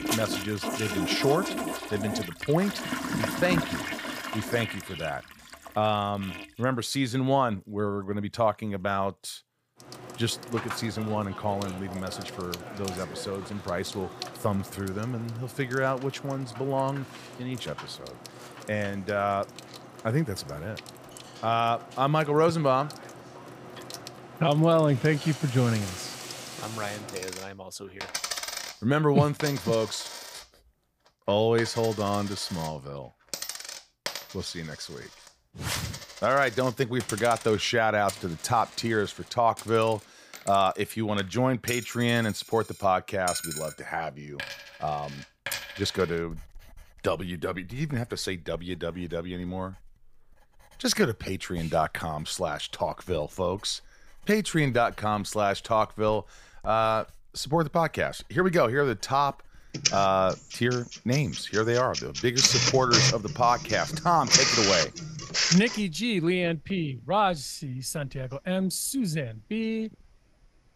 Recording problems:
household noises; loud; throughout; 4 dB below the speech

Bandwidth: 15 kHz